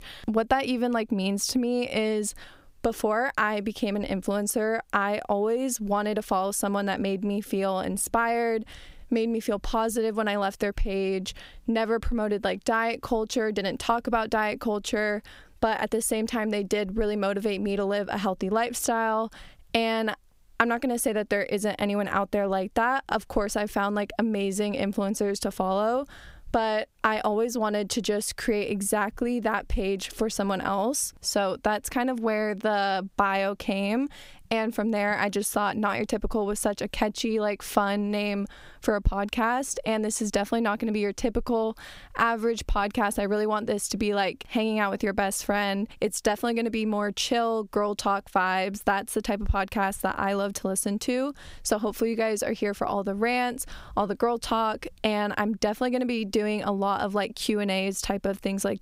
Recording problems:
squashed, flat; somewhat

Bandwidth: 15.5 kHz